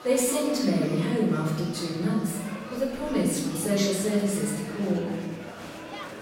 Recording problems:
off-mic speech; far
room echo; noticeable; dies away in 1.1 s
murmuring crowd; noticeable; throughout; 15 dB below the speech
background music; faint; throughout; 20 dB below the speech

